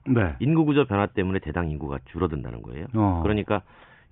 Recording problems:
high frequencies cut off; severe; nothing above 3.5 kHz

